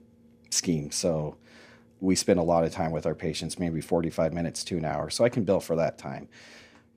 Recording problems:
none

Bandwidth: 15 kHz